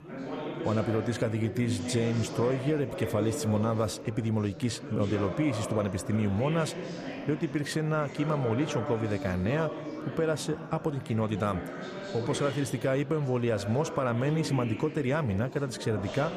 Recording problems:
chatter from many people; loud; throughout; 8 dB below the speech

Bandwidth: 15 kHz